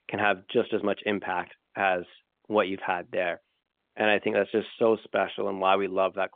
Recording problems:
phone-call audio; nothing above 3.5 kHz

